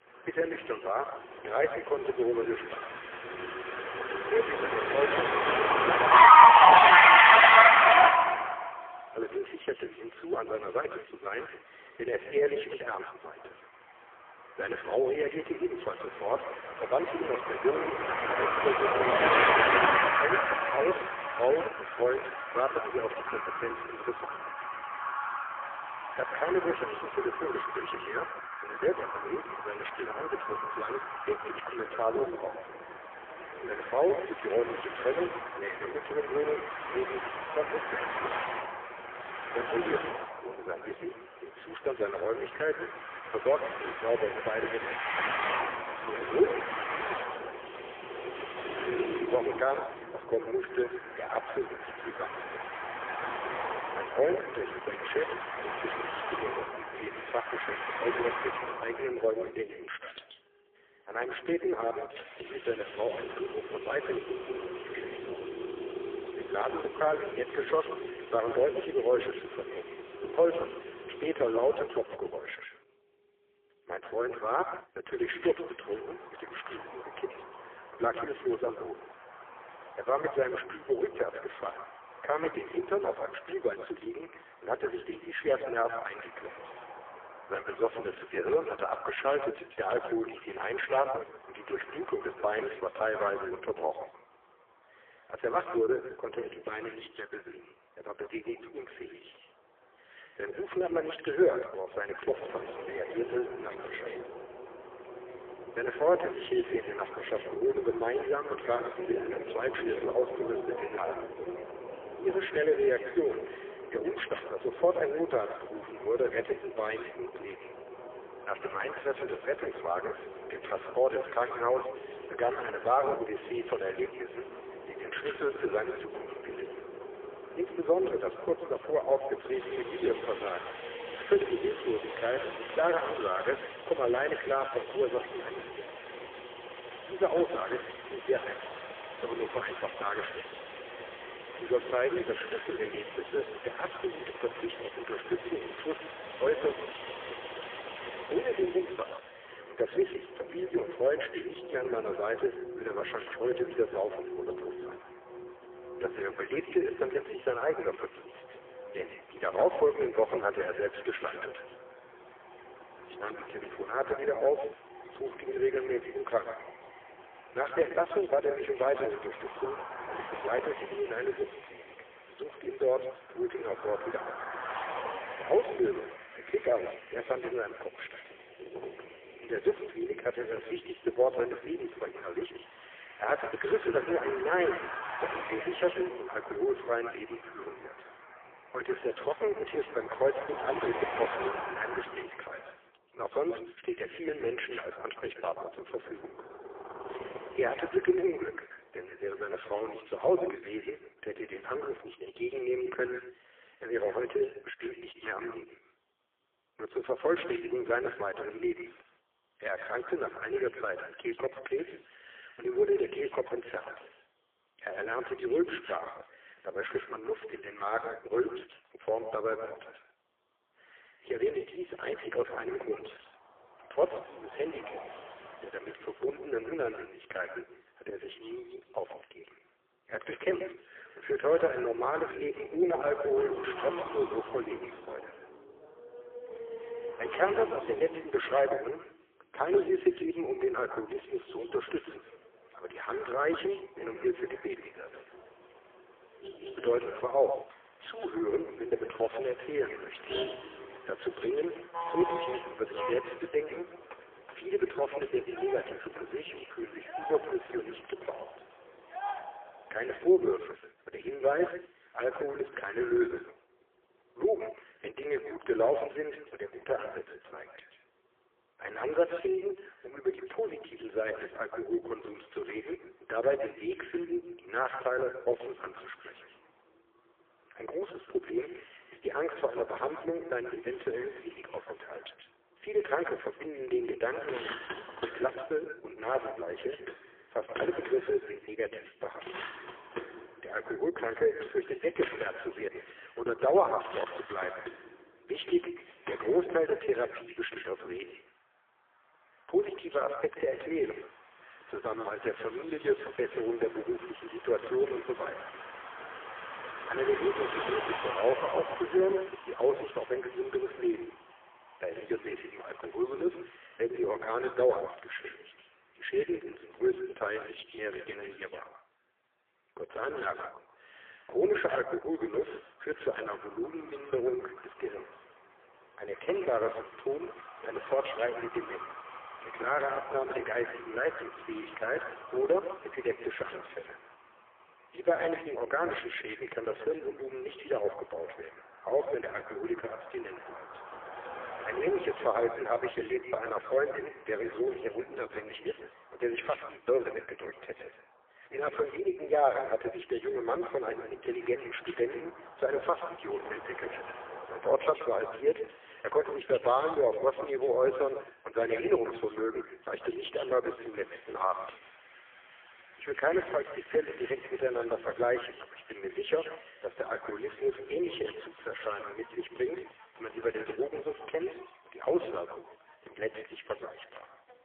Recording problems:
phone-call audio; poor line; nothing above 3.5 kHz
echo of what is said; strong; throughout; 130 ms later, 10 dB below the speech
traffic noise; very loud; throughout; 3 dB above the speech

